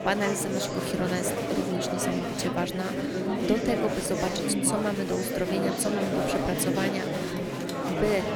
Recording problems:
murmuring crowd; very loud; throughout; 1 dB above the speech
phone ringing; faint; at 7.5 s; peak 10 dB below the speech

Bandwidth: 19 kHz